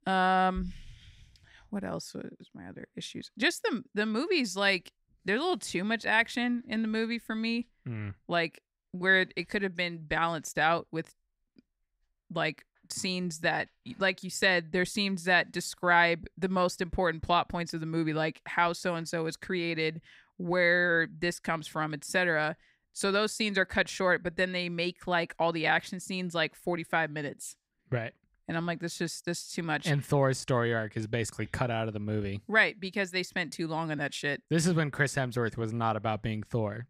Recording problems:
none

